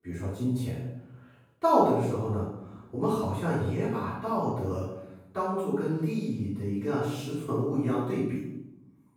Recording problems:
room echo; strong; dies away in 0.8 s
off-mic speech; far

